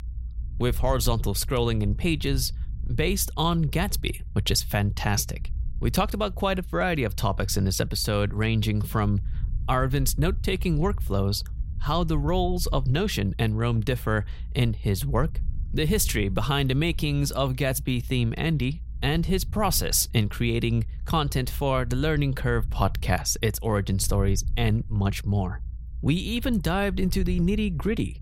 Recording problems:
low rumble; faint; throughout; 25 dB below the speech

